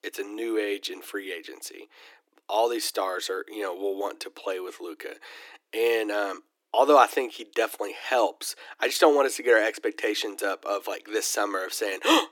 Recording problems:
thin; very; fading below 300 Hz

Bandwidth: 17.5 kHz